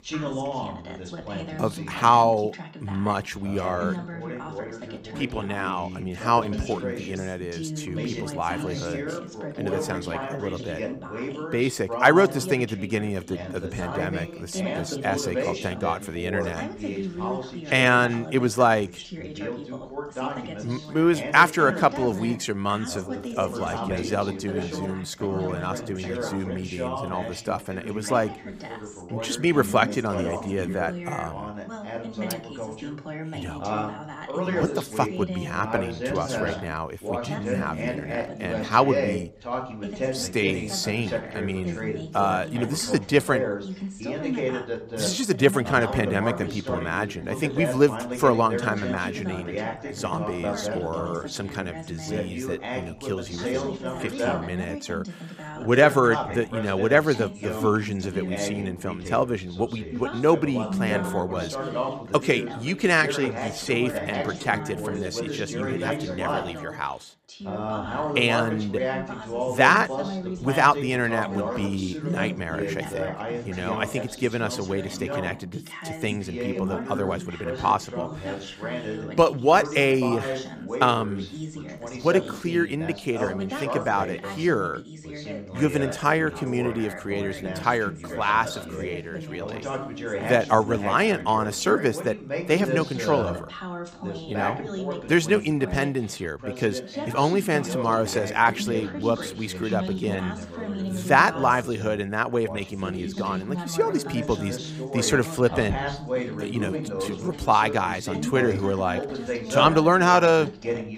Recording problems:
background chatter; loud; throughout; 2 voices, 7 dB below the speech

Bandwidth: 15.5 kHz